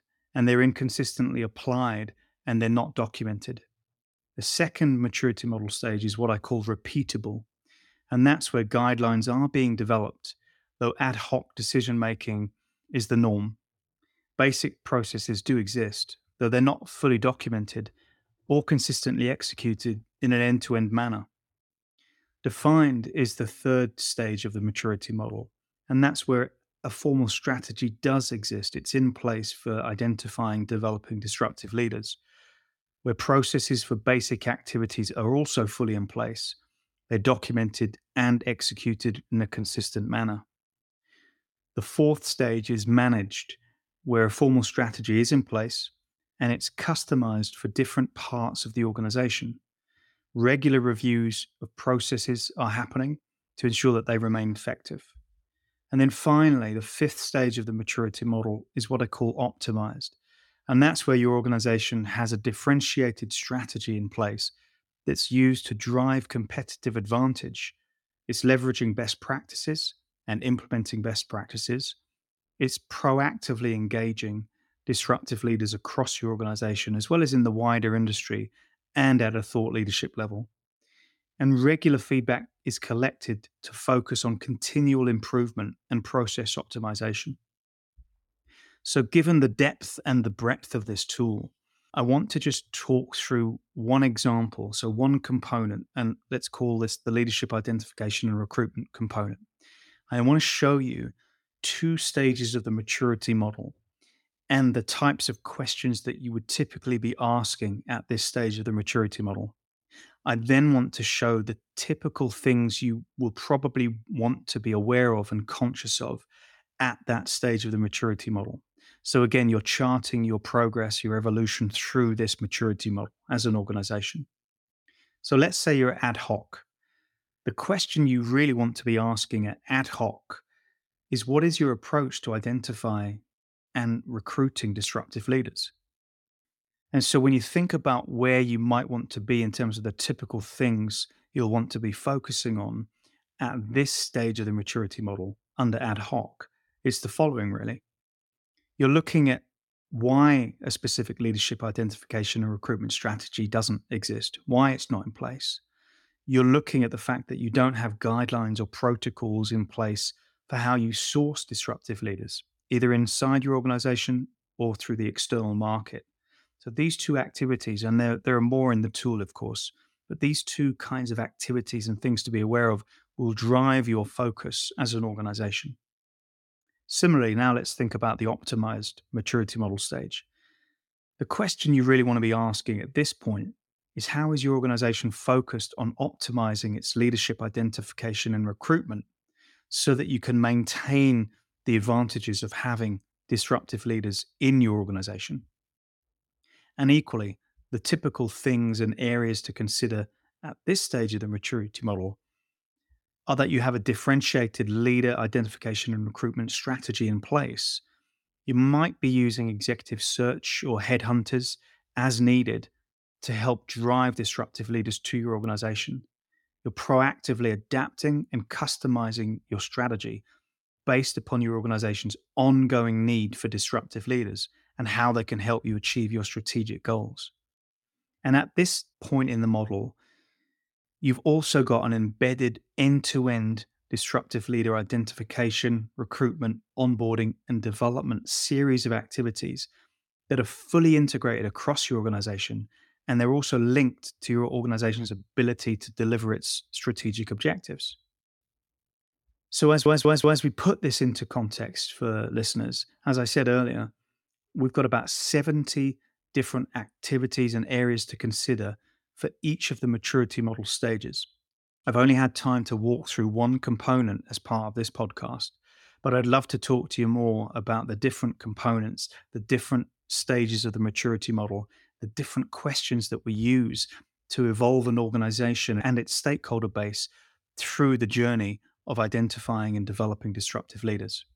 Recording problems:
audio stuttering; at 4:10

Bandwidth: 17 kHz